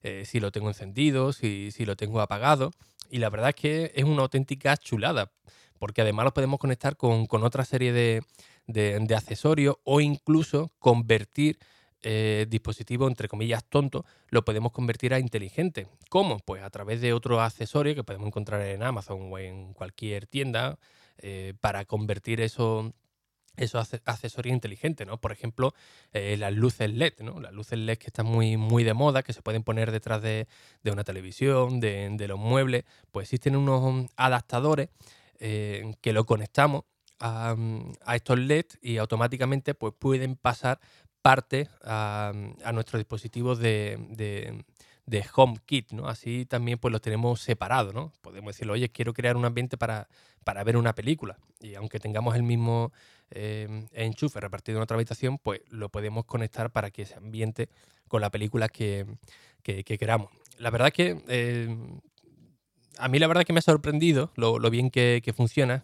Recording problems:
none

